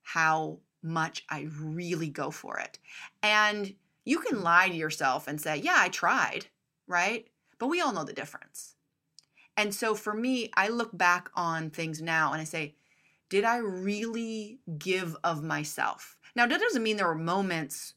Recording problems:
none

